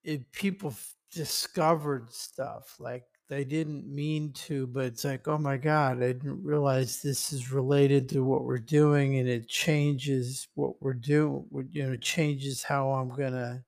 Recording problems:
wrong speed, natural pitch; too slow; 0.6 times normal speed

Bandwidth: 15 kHz